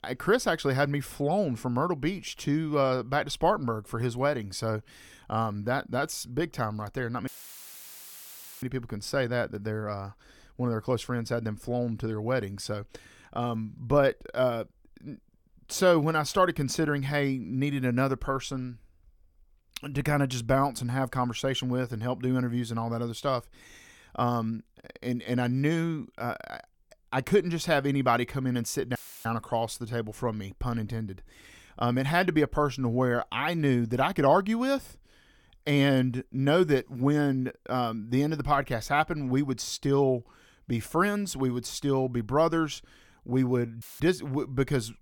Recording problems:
audio cutting out; filled with static; at 7.5 s for 1.5 s, at 29 s and at 44 s

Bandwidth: 17.5 kHz